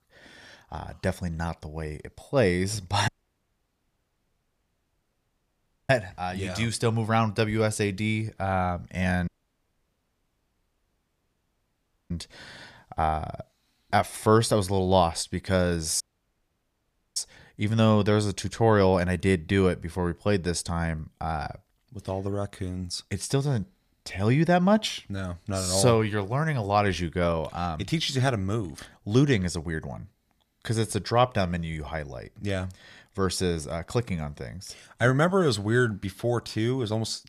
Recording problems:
audio cutting out; at 3 s for 3 s, at 9.5 s for 3 s and at 16 s for 1 s

